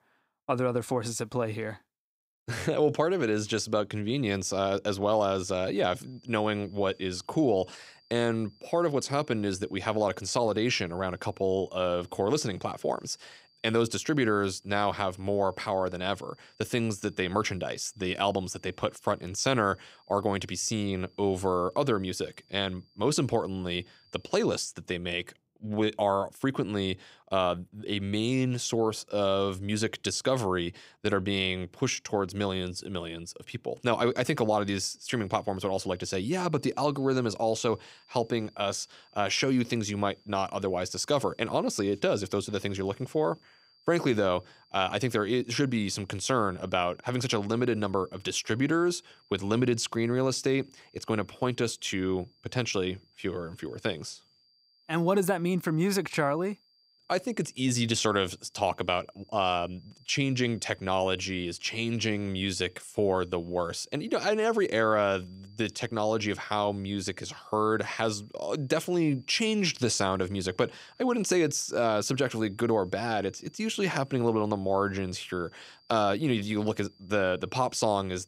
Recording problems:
high-pitched whine; faint; from 5.5 to 25 s and from 34 s on; 4.5 kHz, 30 dB below the speech

